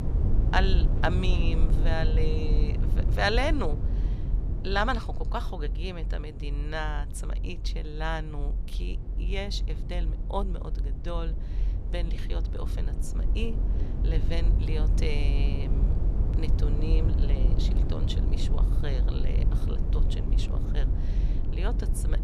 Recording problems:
low rumble; loud; throughout; 9 dB below the speech

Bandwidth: 15.5 kHz